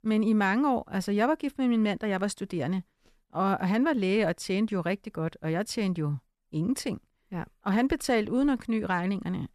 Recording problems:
none

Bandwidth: 13.5 kHz